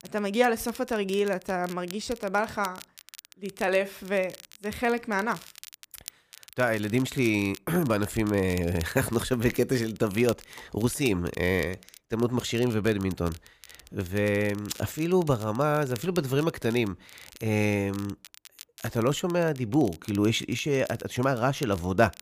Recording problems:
crackle, like an old record; noticeable; 20 dB below the speech

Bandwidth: 15 kHz